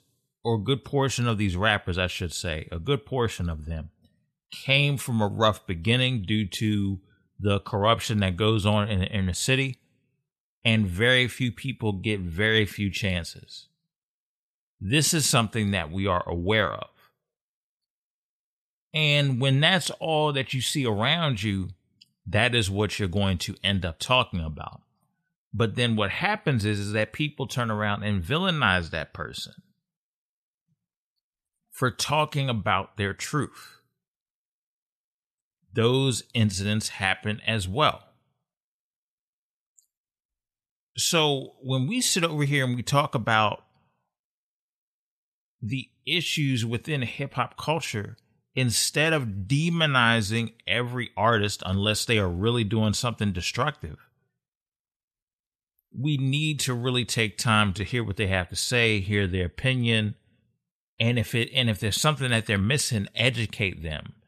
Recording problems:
none

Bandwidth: 13.5 kHz